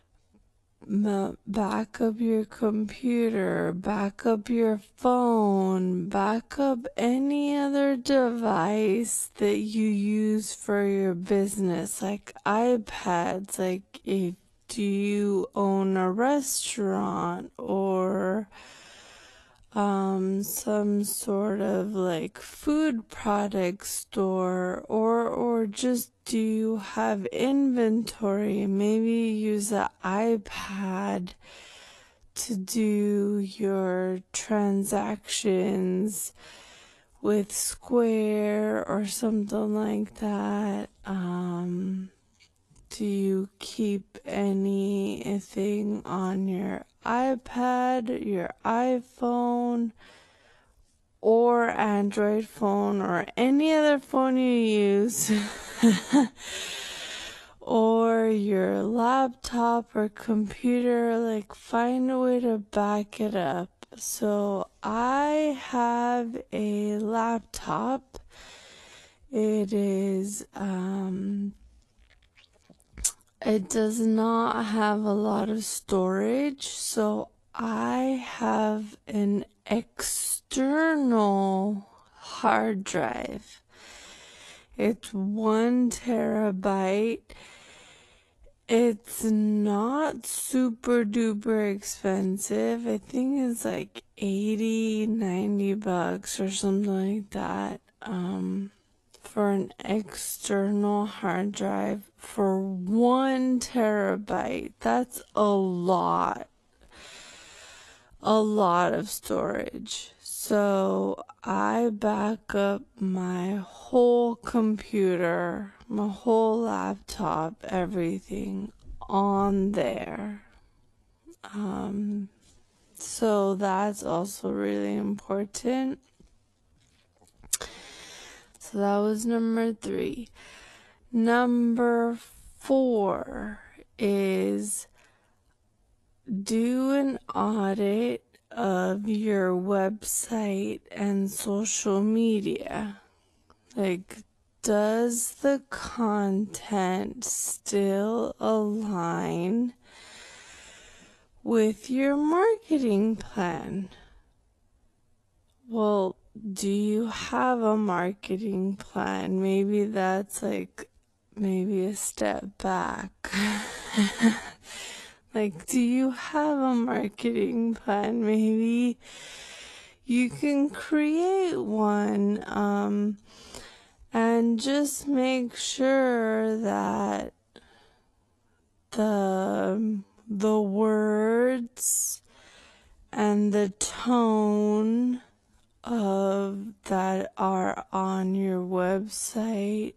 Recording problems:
wrong speed, natural pitch; too slow; 0.5 times normal speed
garbled, watery; slightly; nothing above 12.5 kHz

